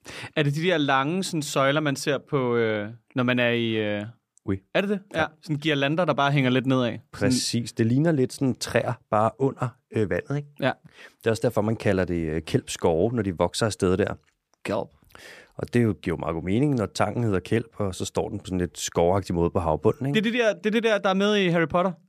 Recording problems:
none

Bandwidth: 15 kHz